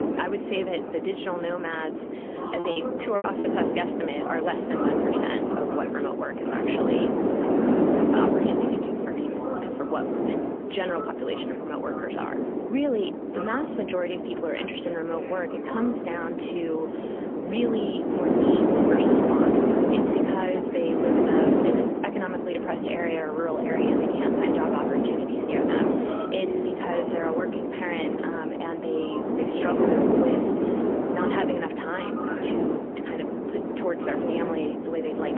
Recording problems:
phone-call audio; poor line; nothing above 3.5 kHz
wind noise on the microphone; heavy; 3 dB above the speech
voice in the background; loud; throughout; 7 dB below the speech
choppy; very; at 2.5 s; 14% of the speech affected

